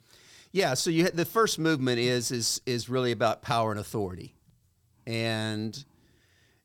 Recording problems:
none

